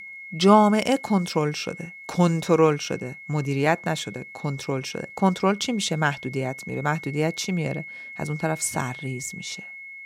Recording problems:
high-pitched whine; noticeable; throughout; 2 kHz, 15 dB below the speech

